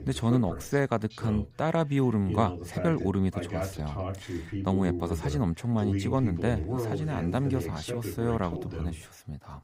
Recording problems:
voice in the background; loud; throughout; 6 dB below the speech

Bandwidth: 15.5 kHz